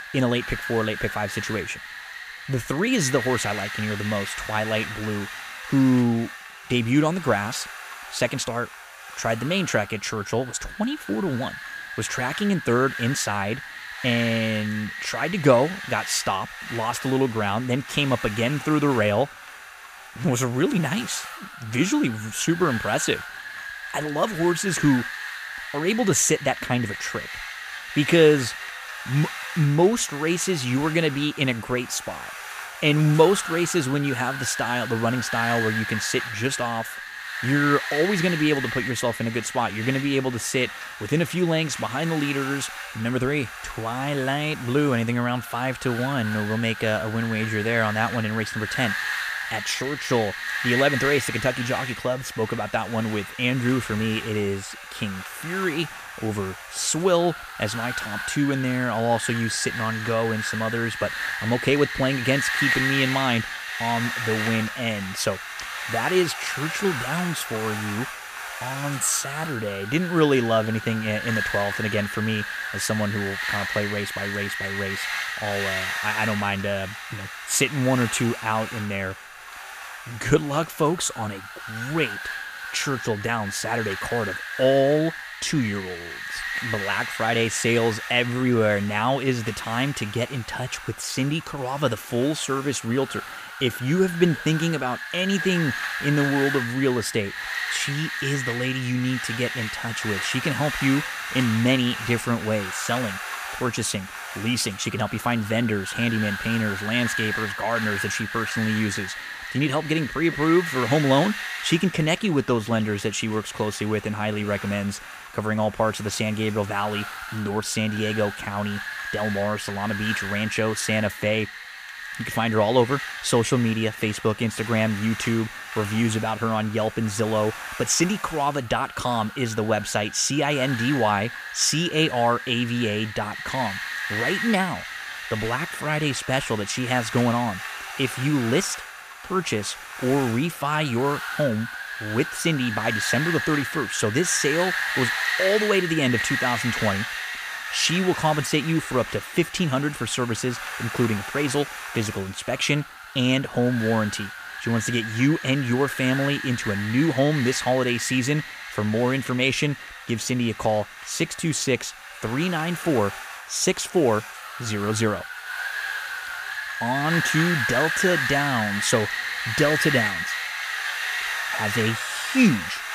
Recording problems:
wind noise on the microphone; heavy; 3 dB below the speech

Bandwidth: 15 kHz